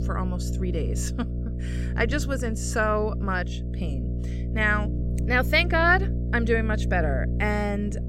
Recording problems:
electrical hum; noticeable; throughout; 60 Hz, 15 dB below the speech

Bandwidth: 16 kHz